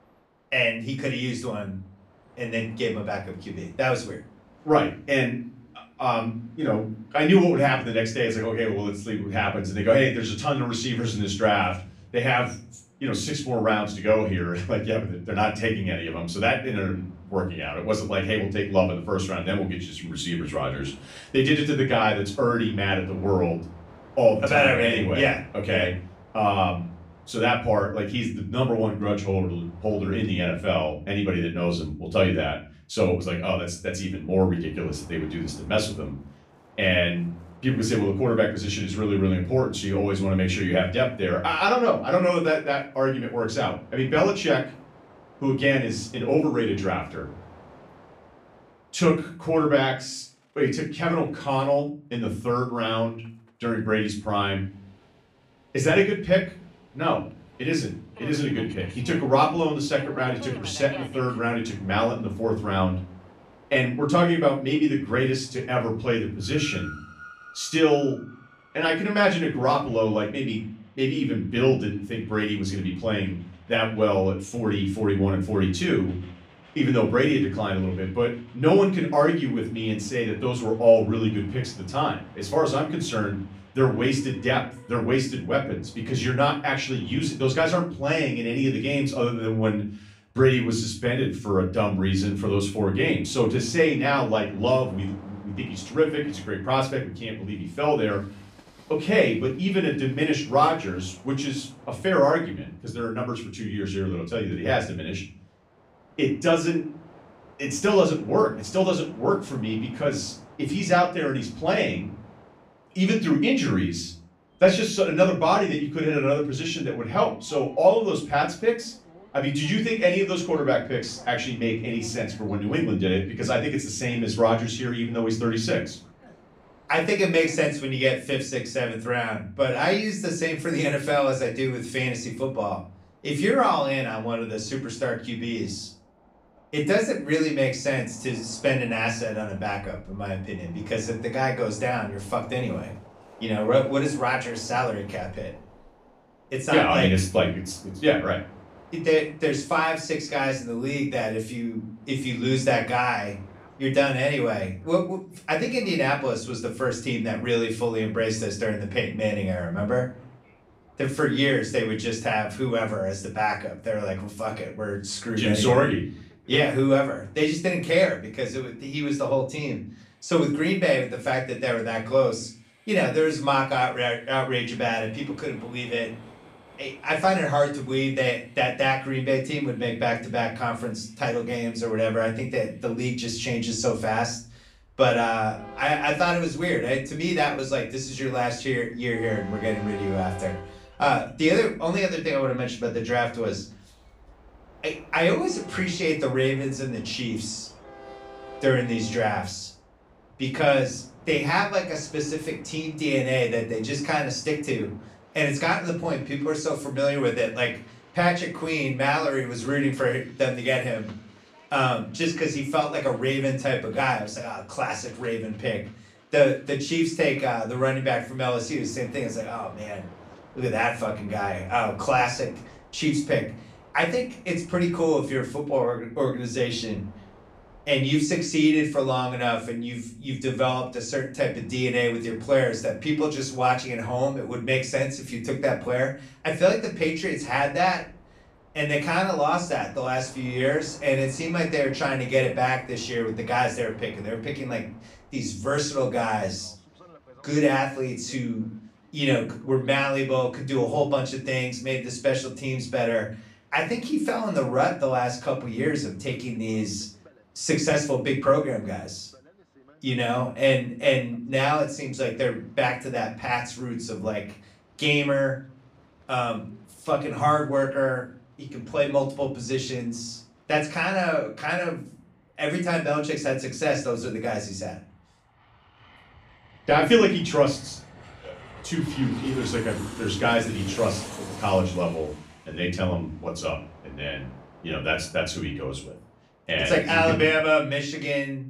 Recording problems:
off-mic speech; far
room echo; slight; dies away in 0.4 s
train or aircraft noise; faint; throughout; 25 dB below the speech

